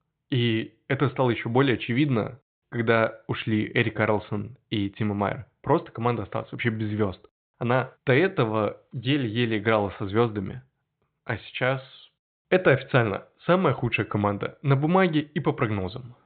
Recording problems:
high frequencies cut off; severe; nothing above 4 kHz

